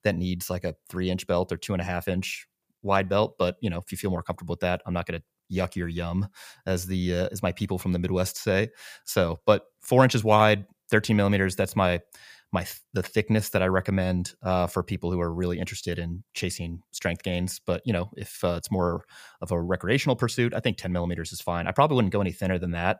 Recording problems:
none

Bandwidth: 15 kHz